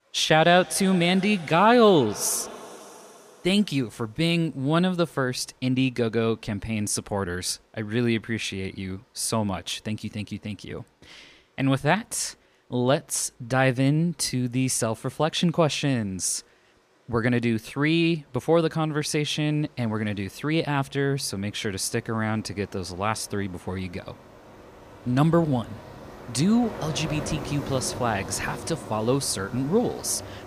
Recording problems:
rain or running water; noticeable; throughout; 15 dB below the speech

